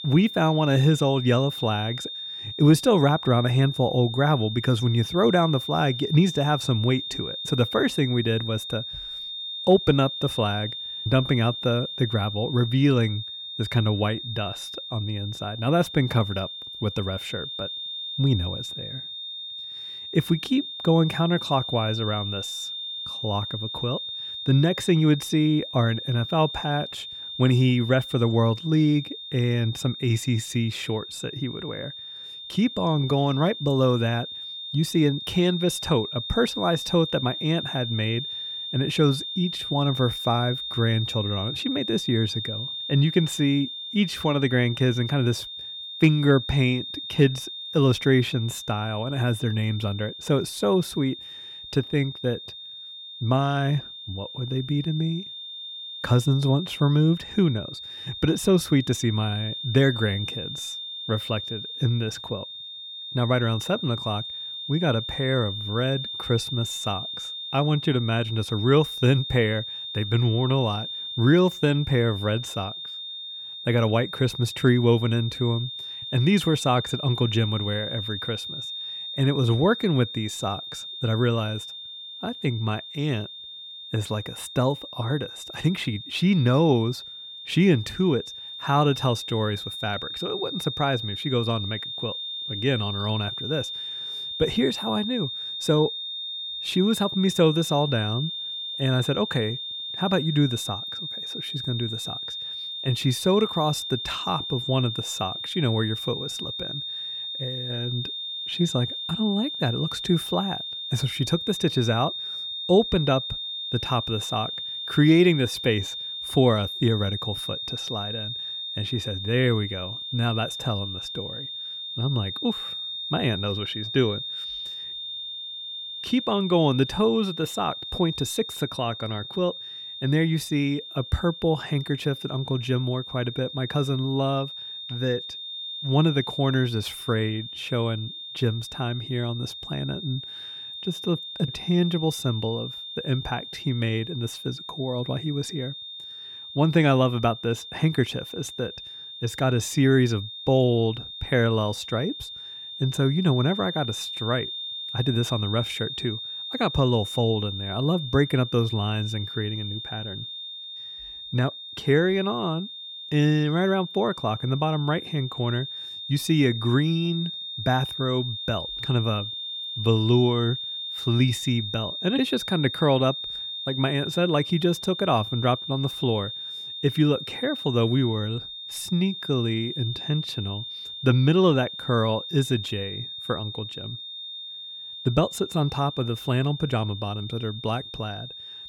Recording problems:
high-pitched whine; loud; throughout; 3.5 kHz, 7 dB below the speech

